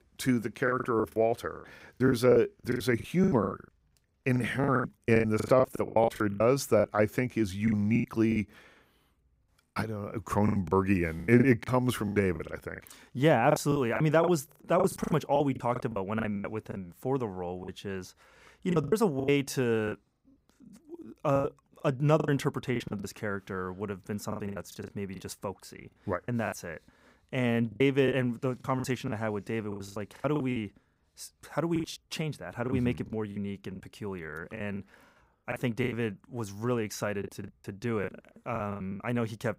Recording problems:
choppy; very; 15% of the speech affected

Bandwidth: 15.5 kHz